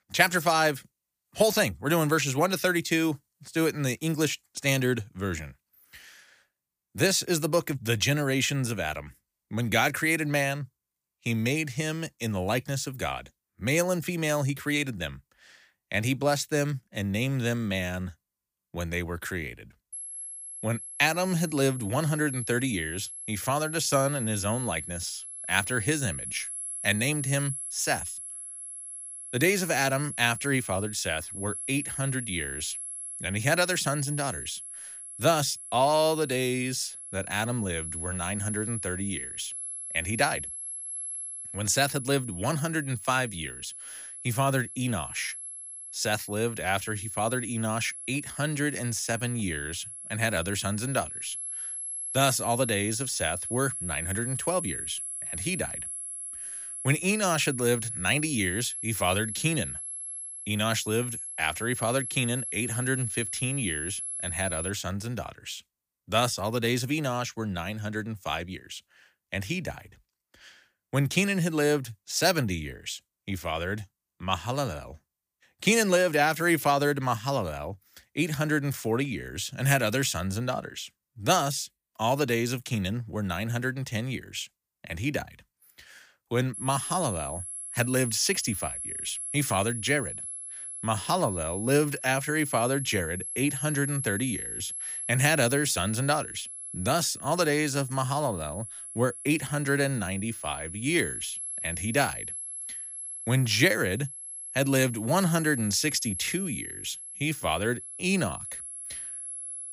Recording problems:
high-pitched whine; loud; from 20 s to 1:05 and from 1:27 on; 11 kHz, 7 dB below the speech

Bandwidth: 15 kHz